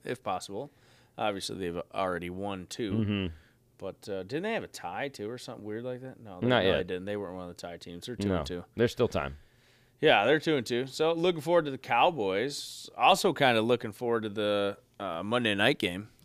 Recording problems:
none

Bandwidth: 15 kHz